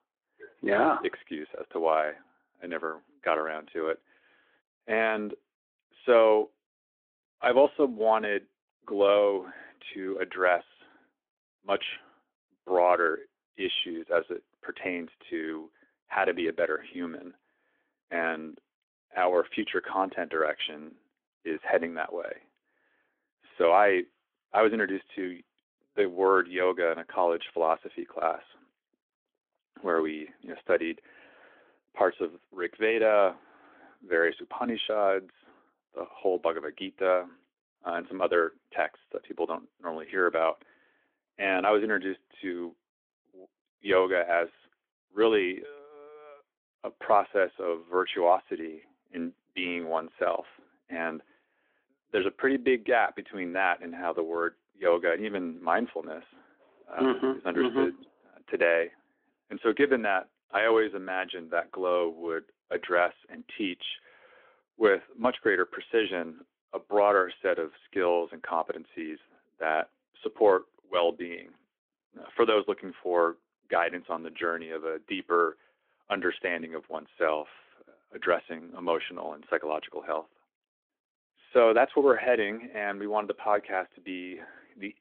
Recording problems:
phone-call audio

